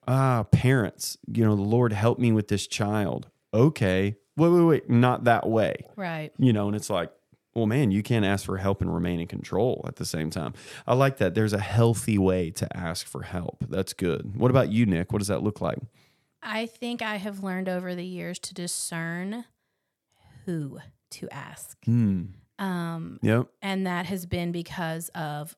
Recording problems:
none

